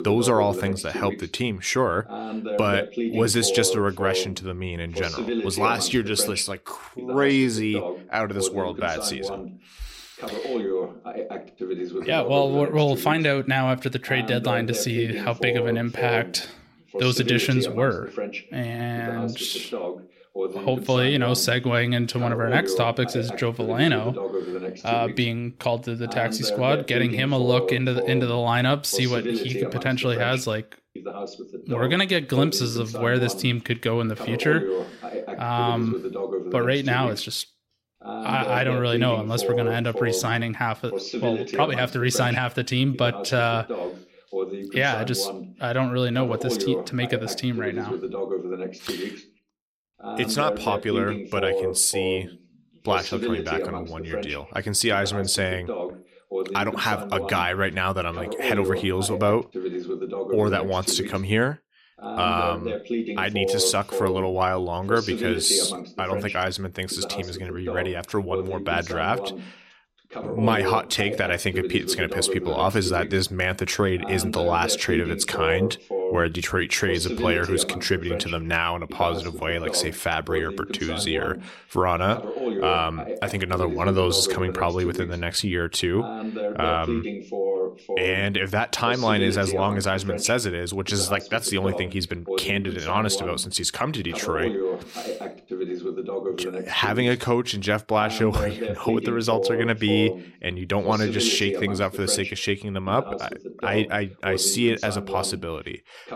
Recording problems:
voice in the background; loud; throughout; 6 dB below the speech

